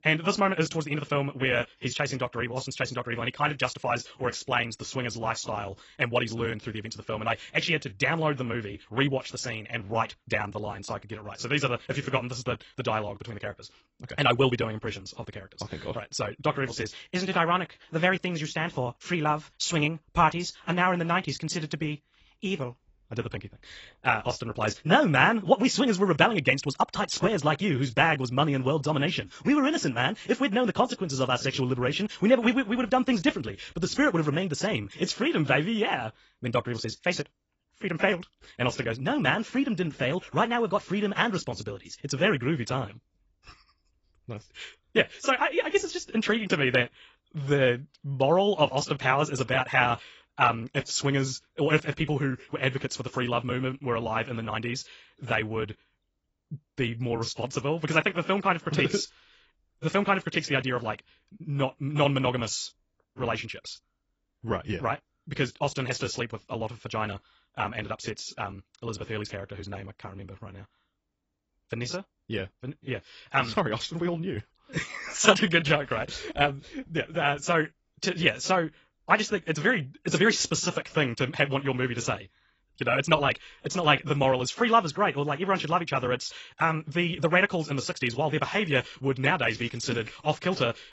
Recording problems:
garbled, watery; badly; nothing above 7.5 kHz
wrong speed, natural pitch; too fast; 1.5 times normal speed

